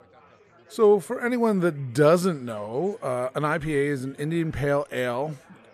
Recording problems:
chatter from many people; faint; throughout; 30 dB below the speech

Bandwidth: 14.5 kHz